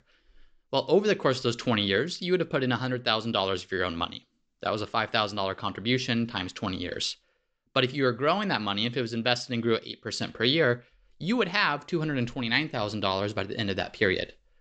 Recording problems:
high frequencies cut off; noticeable; nothing above 8 kHz

